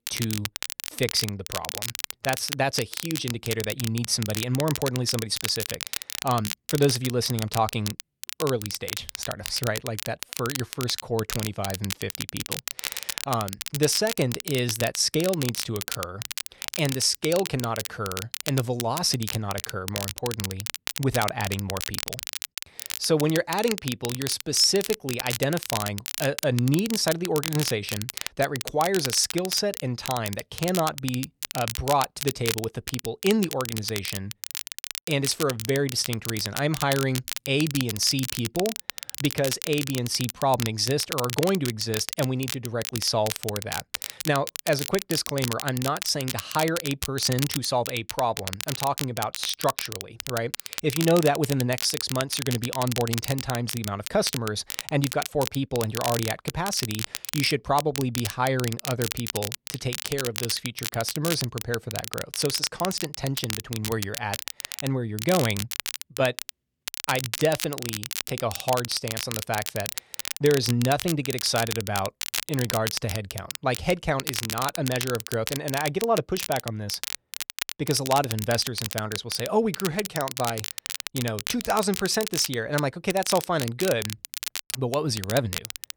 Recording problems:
crackle, like an old record; loud; 6 dB below the speech

